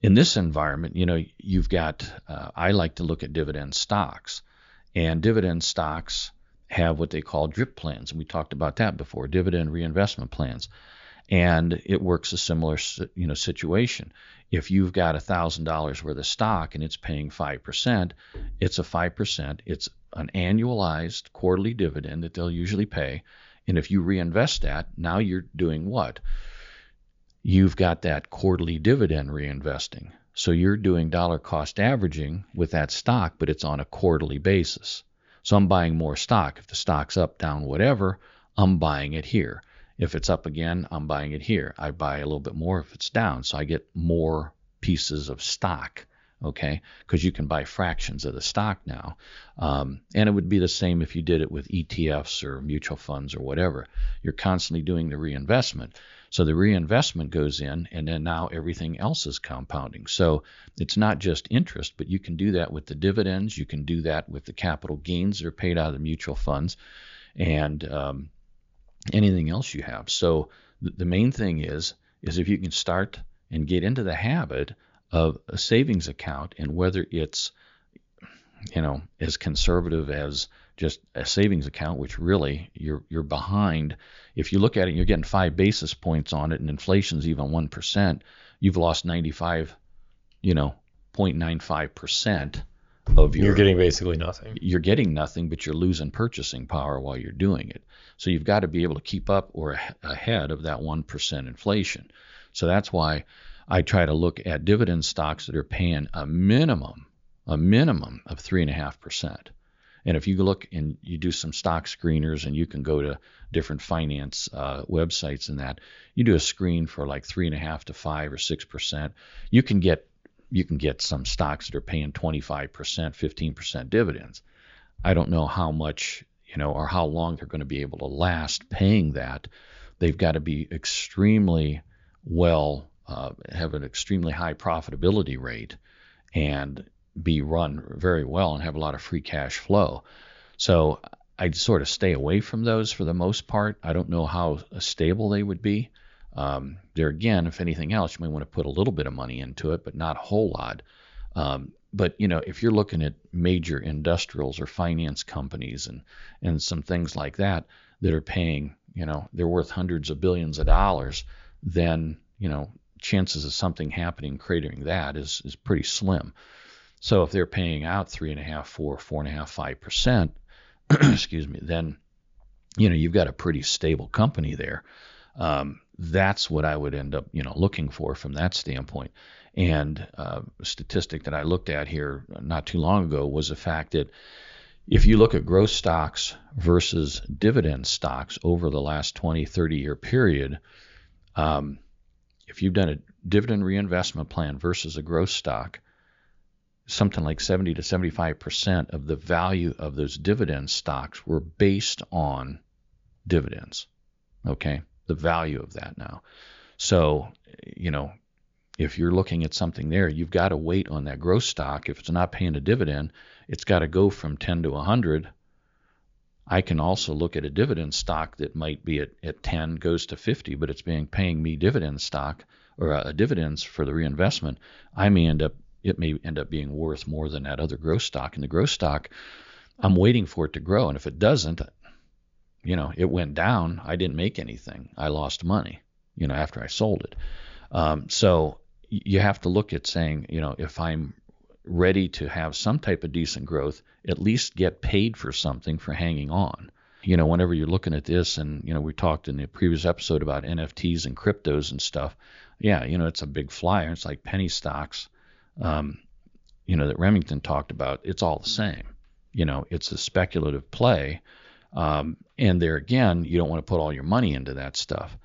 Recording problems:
high frequencies cut off; noticeable; nothing above 7 kHz

